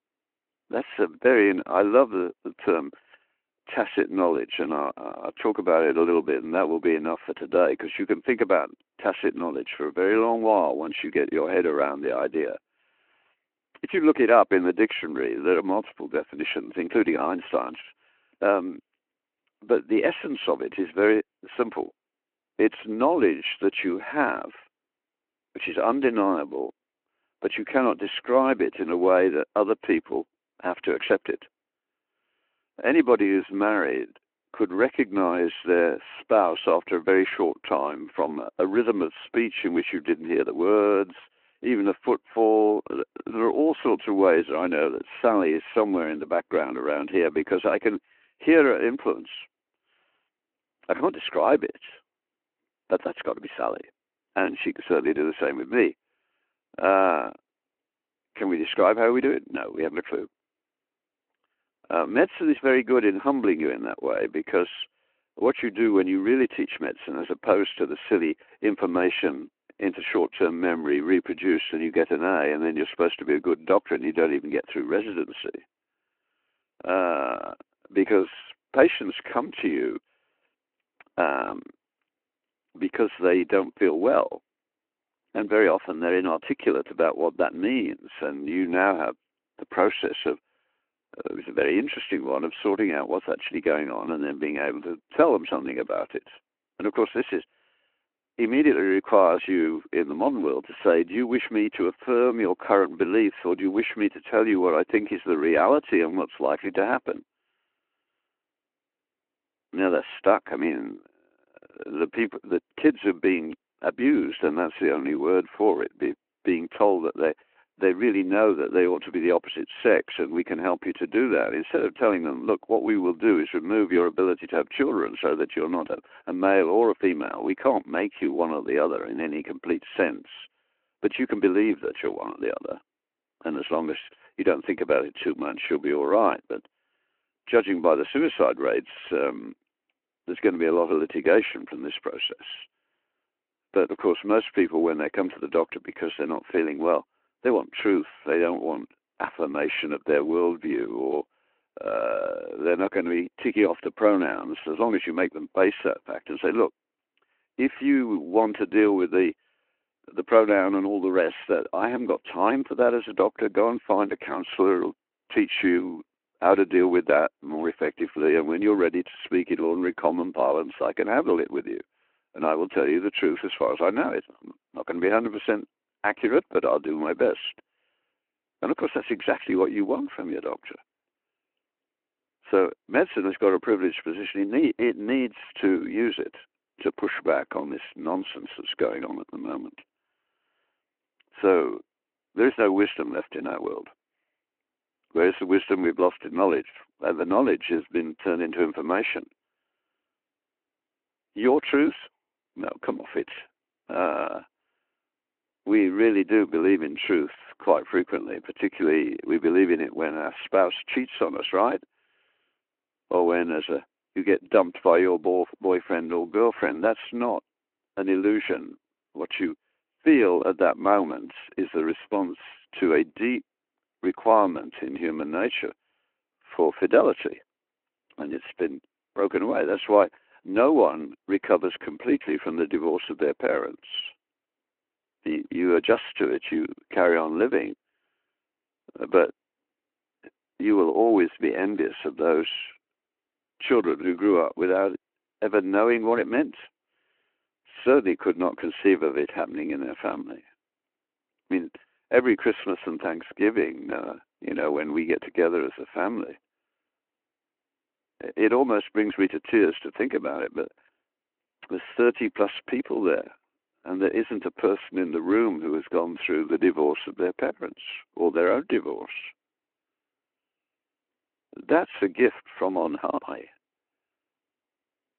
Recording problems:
phone-call audio

